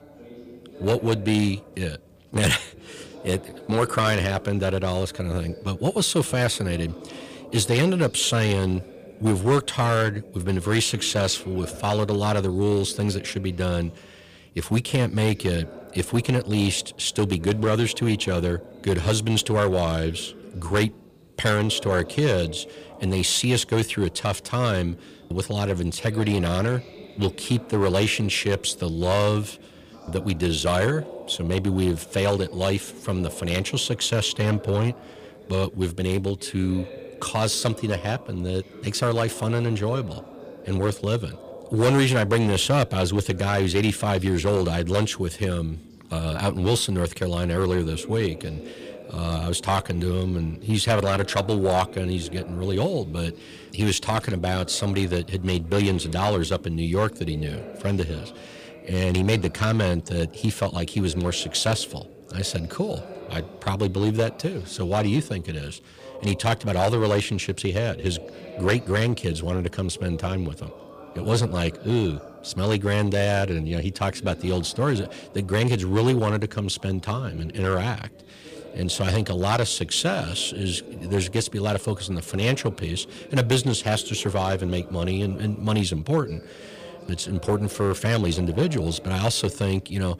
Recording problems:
distortion; slight; 3% of the sound clipped
background chatter; noticeable; throughout; 4 voices, 20 dB below the speech

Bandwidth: 15 kHz